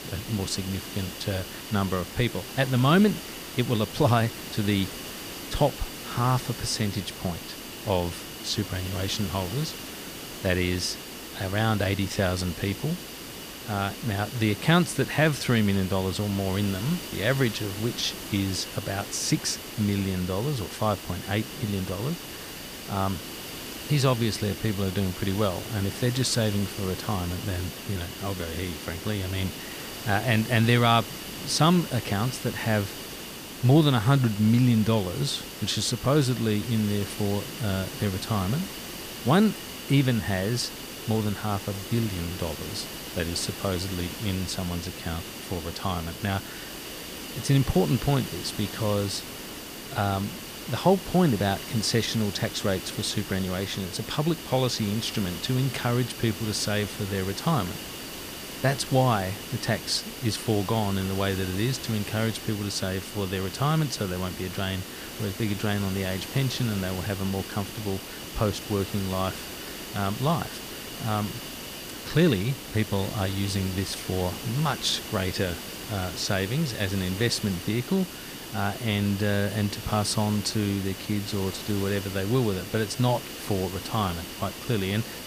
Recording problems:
hiss; loud; throughout; 9 dB below the speech

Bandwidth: 15 kHz